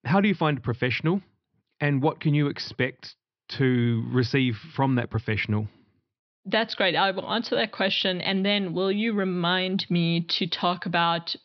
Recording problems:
high frequencies cut off; noticeable; nothing above 5.5 kHz

